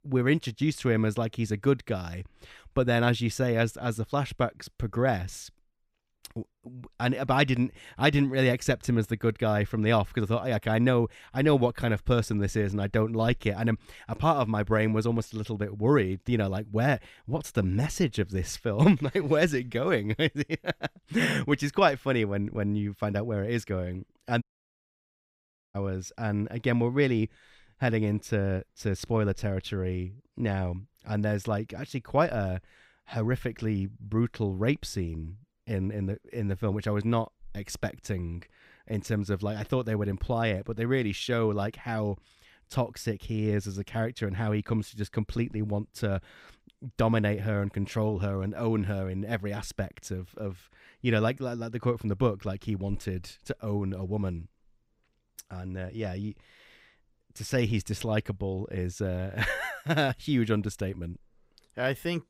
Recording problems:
audio cutting out; at 24 s for 1.5 s

